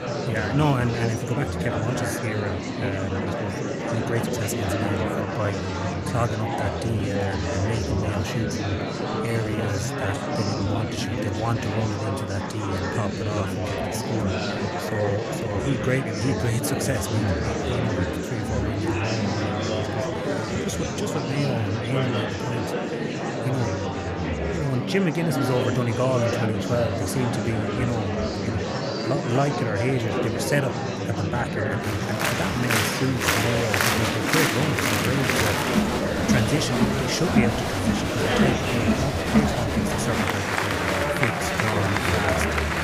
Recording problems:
murmuring crowd; very loud; throughout; 3 dB above the speech
uneven, jittery; strongly; from 1.5 to 42 s

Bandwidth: 15 kHz